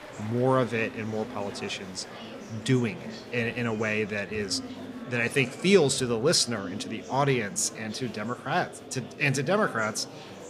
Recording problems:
murmuring crowd; noticeable; throughout; 15 dB below the speech

